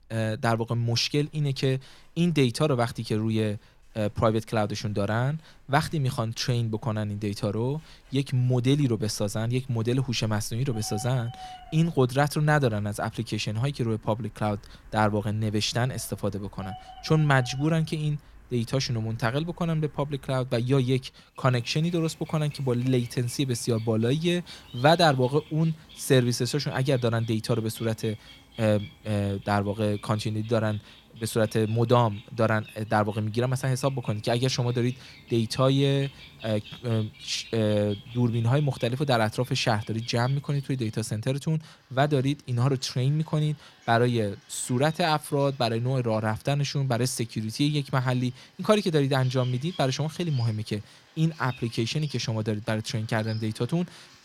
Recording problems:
animal sounds; faint; throughout; 20 dB below the speech

